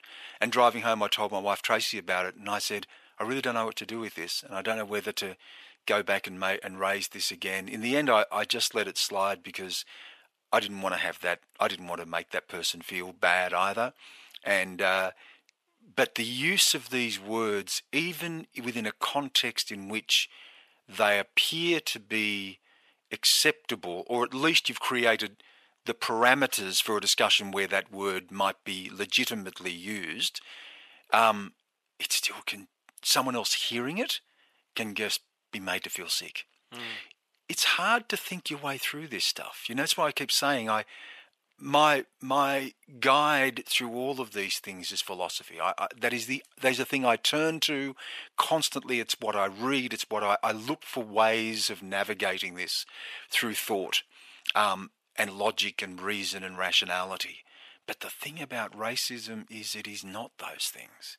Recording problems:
thin; very; fading below 700 Hz

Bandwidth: 14 kHz